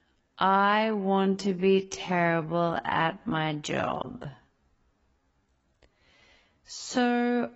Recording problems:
garbled, watery; badly; nothing above 7.5 kHz
wrong speed, natural pitch; too slow; 0.5 times normal speed

